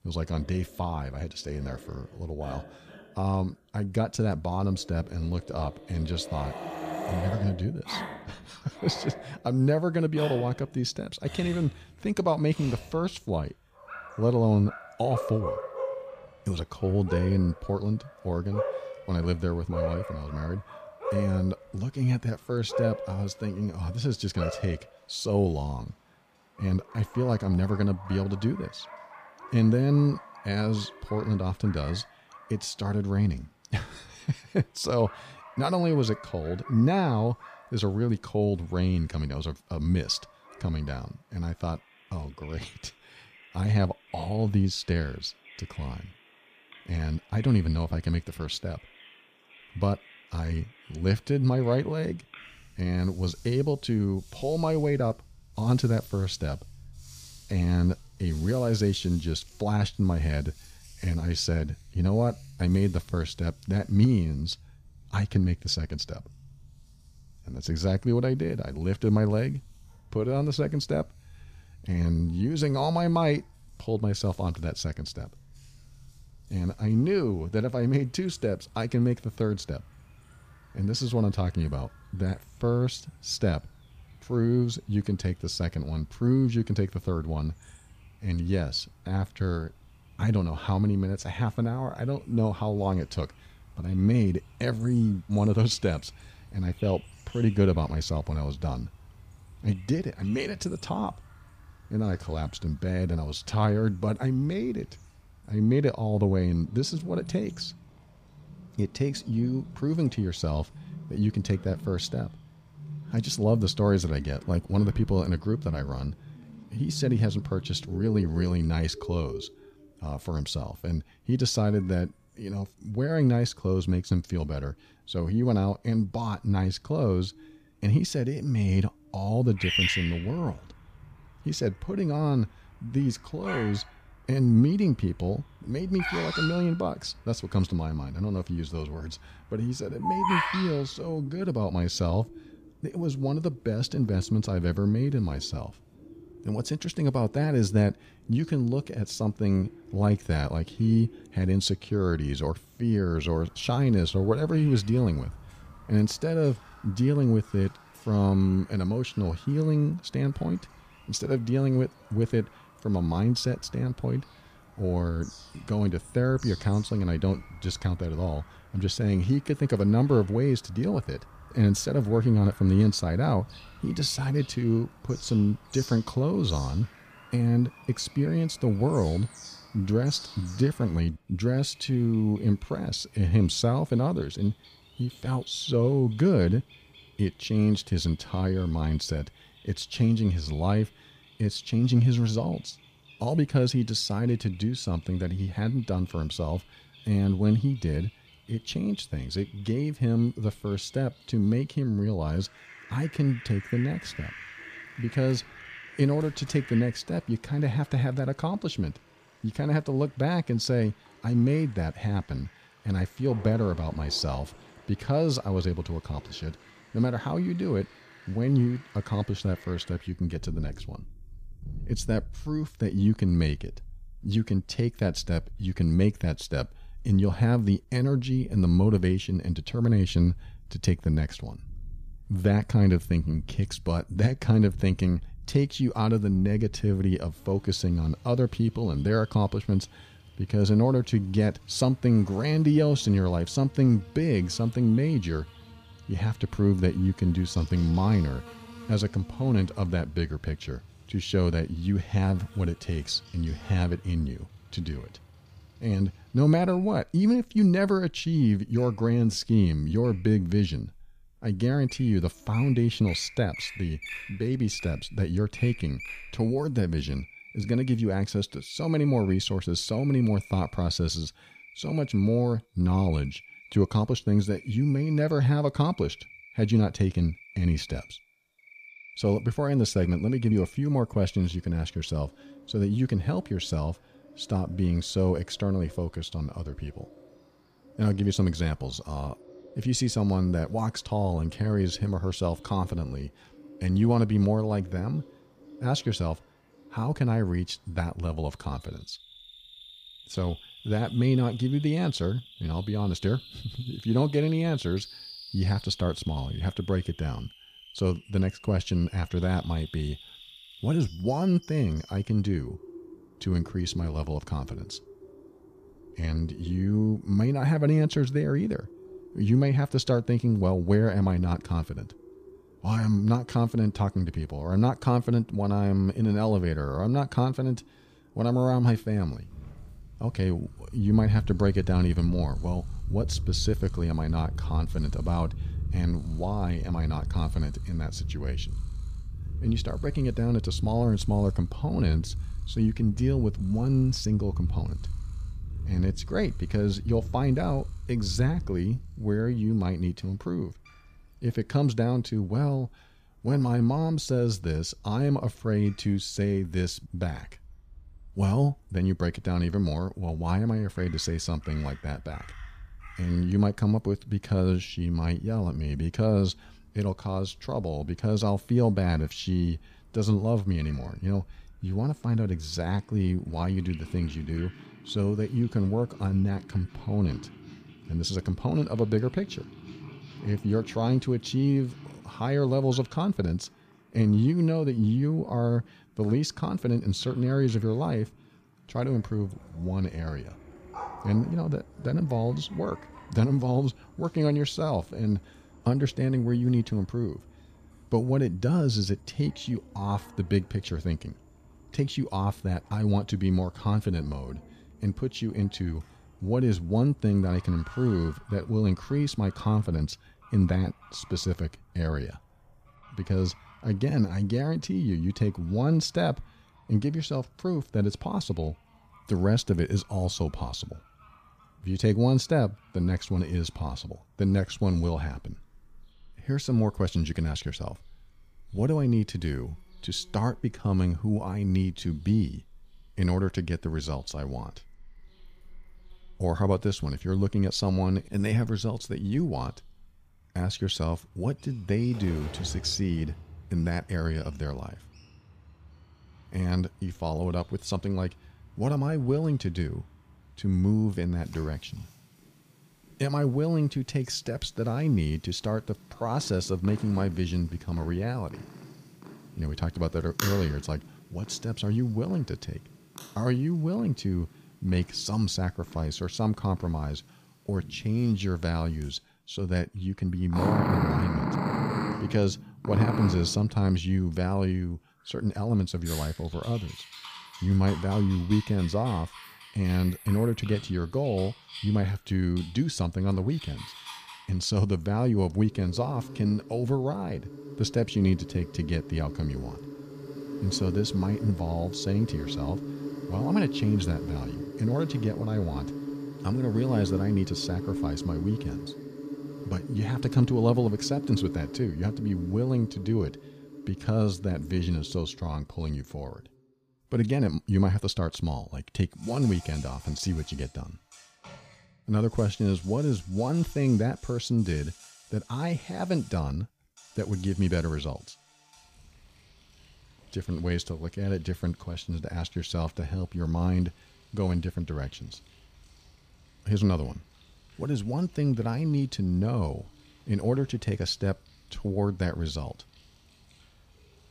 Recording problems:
animal sounds; noticeable; throughout; 15 dB below the speech

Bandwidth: 15 kHz